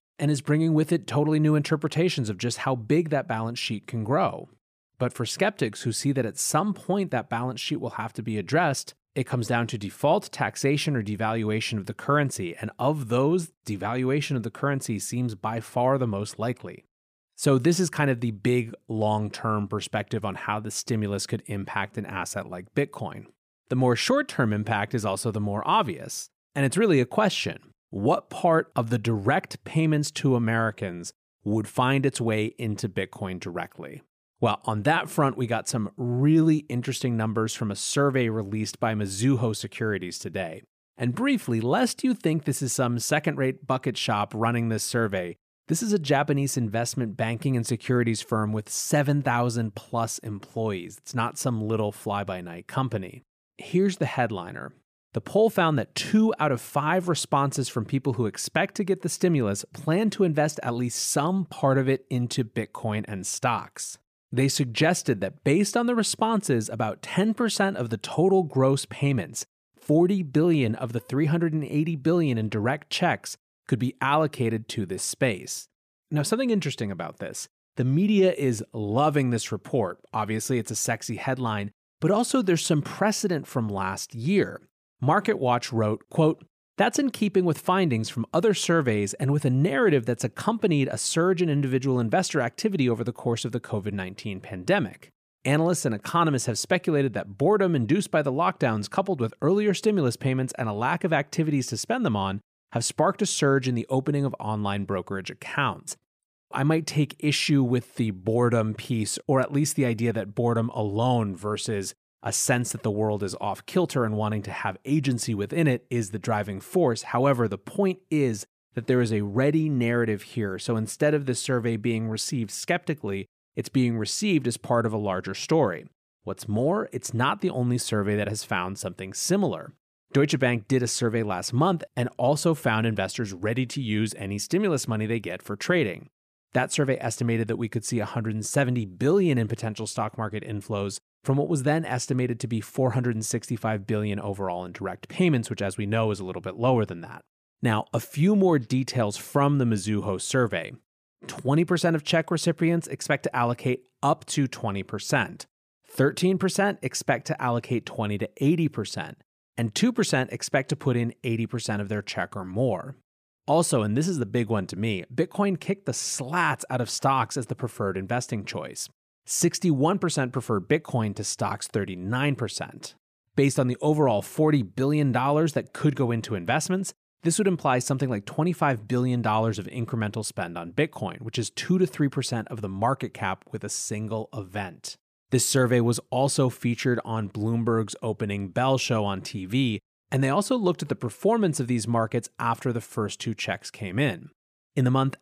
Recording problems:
none

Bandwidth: 15 kHz